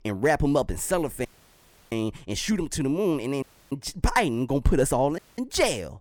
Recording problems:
audio cutting out; at 1.5 s for 0.5 s, at 3.5 s and at 5 s

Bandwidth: 19 kHz